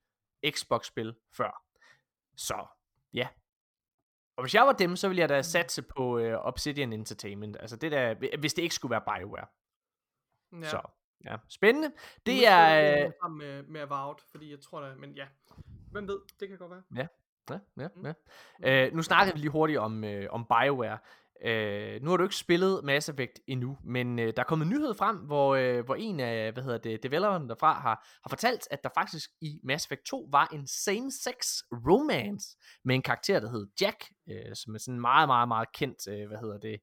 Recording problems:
none

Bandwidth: 17 kHz